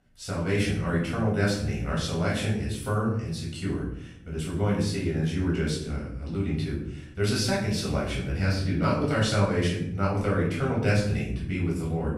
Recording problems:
off-mic speech; far
room echo; noticeable; dies away in 0.7 s

